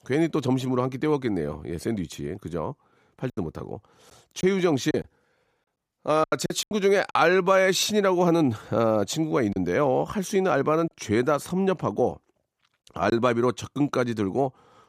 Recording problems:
choppy; very; from 3.5 to 7 s and from 9.5 to 11 s; 9% of the speech affected

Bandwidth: 15 kHz